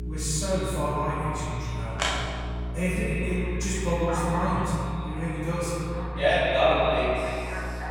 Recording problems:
echo of what is said; strong; throughout; 130 ms later, 7 dB below the speech
room echo; strong; dies away in 1.9 s
off-mic speech; far
alarms or sirens; loud; throughout; 8 dB below the speech
electrical hum; noticeable; throughout; 60 Hz, 20 dB below the speech

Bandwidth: 18.5 kHz